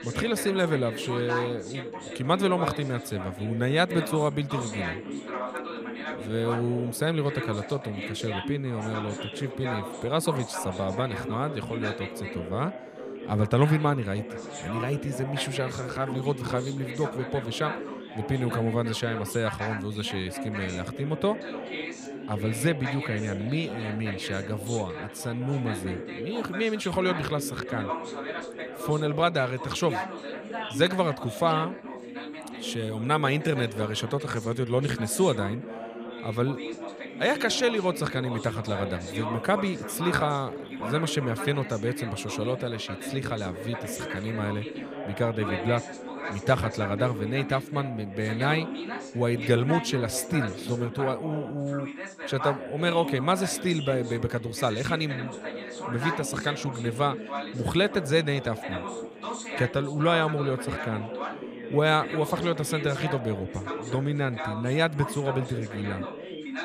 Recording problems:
background chatter; loud; throughout; 3 voices, 7 dB below the speech

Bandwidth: 15 kHz